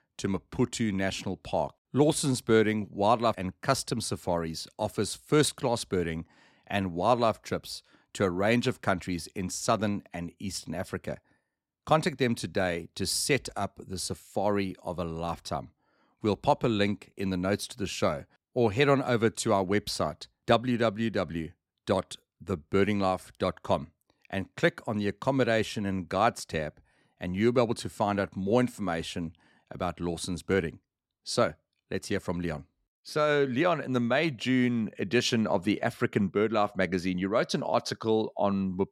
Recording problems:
none

